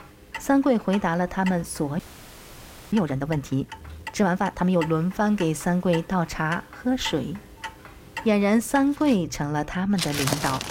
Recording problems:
household noises; noticeable; throughout; 10 dB below the speech
audio freezing; at 2 s for 1 s

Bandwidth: 16 kHz